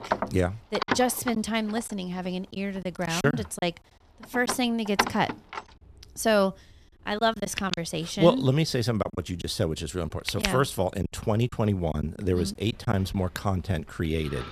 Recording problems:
household noises; loud; throughout; 6 dB below the speech
choppy; occasionally; 5% of the speech affected

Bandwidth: 14 kHz